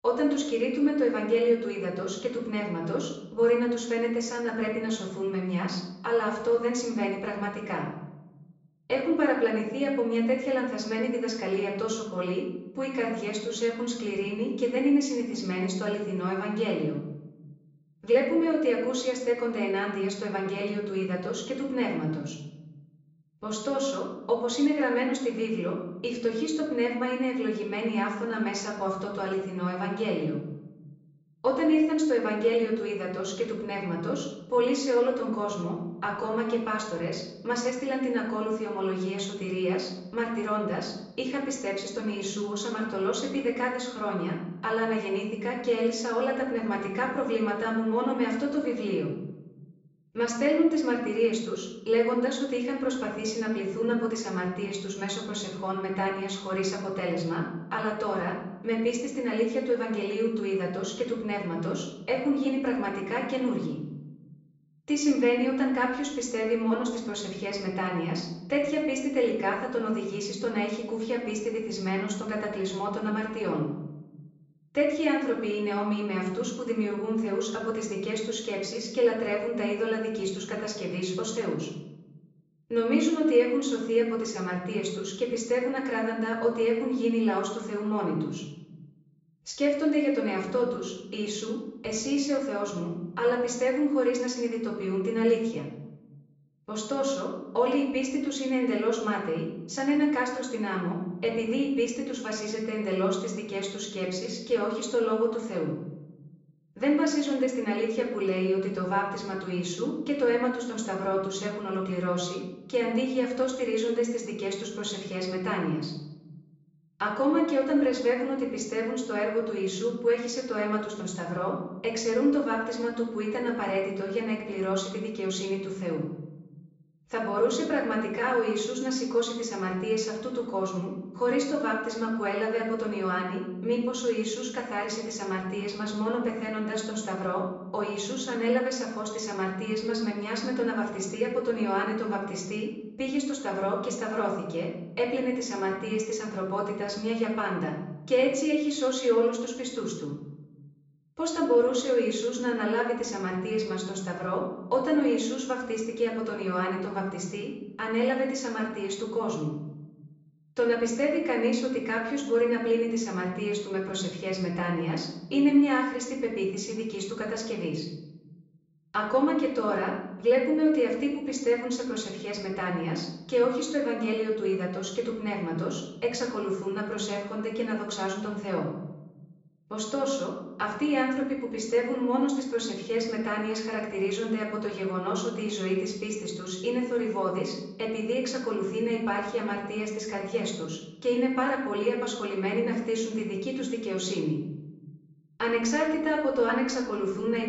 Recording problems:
off-mic speech; far
room echo; noticeable; dies away in 0.8 s
high frequencies cut off; noticeable; nothing above 8 kHz

